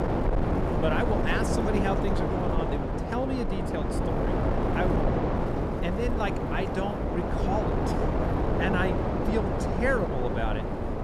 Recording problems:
wind noise on the microphone; heavy; 1 dB above the speech

